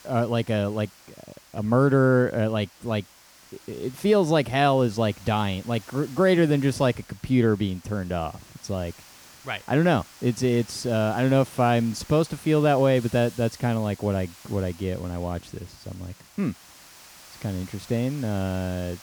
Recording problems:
hiss; faint; throughout; 20 dB below the speech

